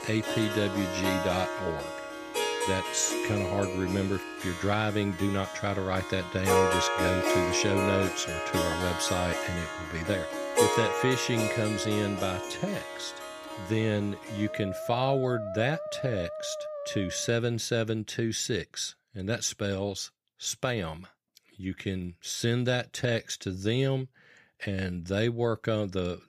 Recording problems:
background music; loud; until 17 s; 1 dB below the speech

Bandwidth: 15 kHz